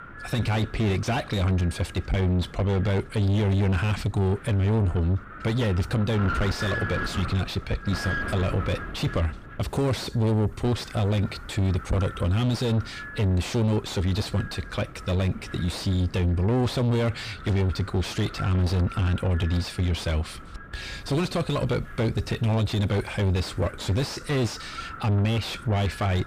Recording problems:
distortion; heavy; 6 dB below the speech
wind noise on the microphone; heavy; 5 dB below the speech

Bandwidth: 15 kHz